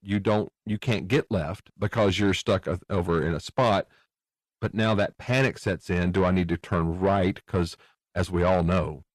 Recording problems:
distortion; slight; 10 dB below the speech

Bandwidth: 13.5 kHz